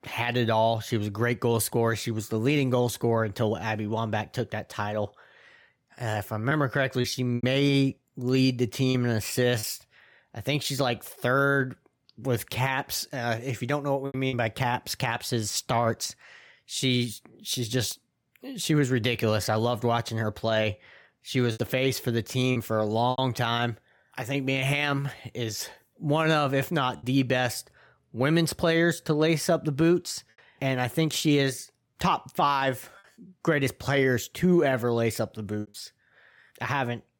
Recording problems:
choppy; occasionally; 2% of the speech affected

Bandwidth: 18 kHz